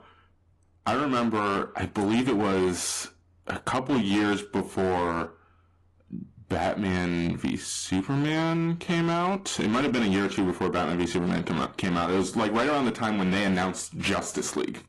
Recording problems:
distortion; slight; 12% of the sound clipped
garbled, watery; slightly; nothing above 11 kHz

